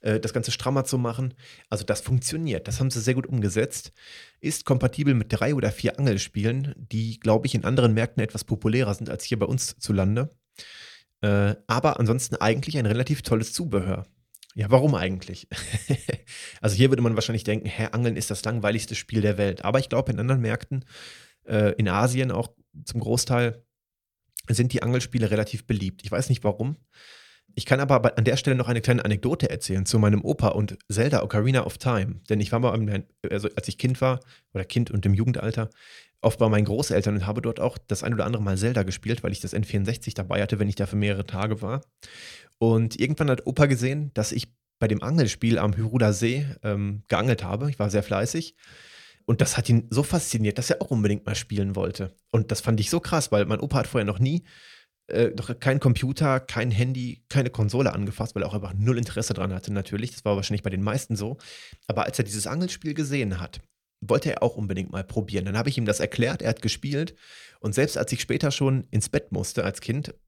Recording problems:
none

